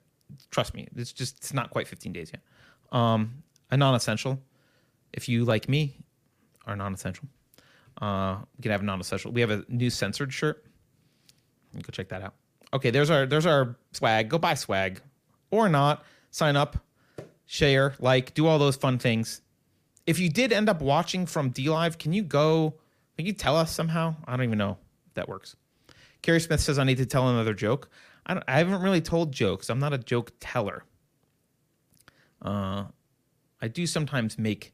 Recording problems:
none

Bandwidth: 15 kHz